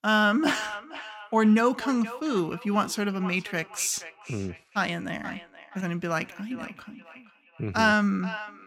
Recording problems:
echo of what is said; noticeable; throughout; 470 ms later, 15 dB below the speech

